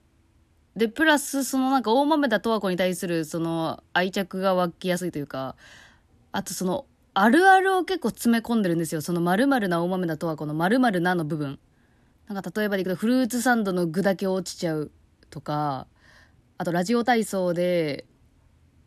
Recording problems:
uneven, jittery; strongly; from 1 to 18 s

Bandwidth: 14 kHz